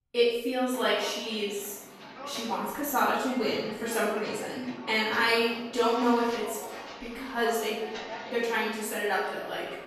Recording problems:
room echo; strong; dies away in 0.8 s
off-mic speech; far
footsteps; noticeable; from 0.5 s on; peak 9 dB below the speech

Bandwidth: 13.5 kHz